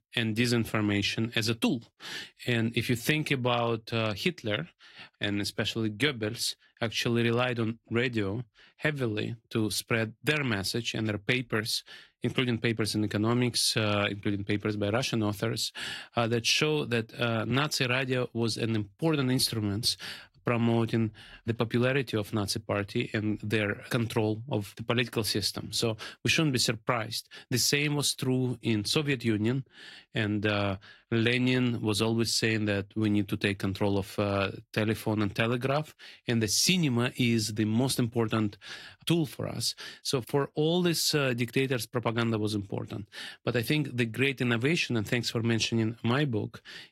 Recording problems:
garbled, watery; slightly

